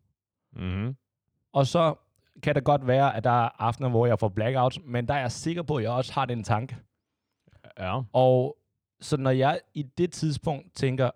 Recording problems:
none

